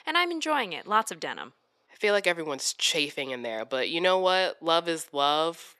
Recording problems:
thin; somewhat; fading below 450 Hz

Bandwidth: 13.5 kHz